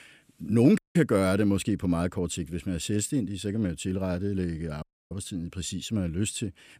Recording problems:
audio cutting out; at 1 s and at 5 s

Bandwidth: 15 kHz